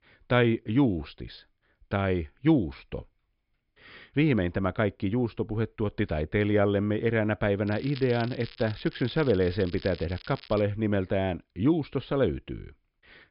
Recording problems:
high frequencies cut off; noticeable; nothing above 5.5 kHz
crackling; noticeable; from 7.5 to 11 s; 20 dB below the speech

